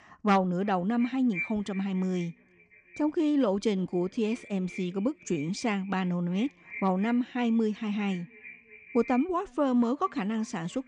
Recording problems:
echo of what is said; noticeable; throughout; 350 ms later, 15 dB below the speech

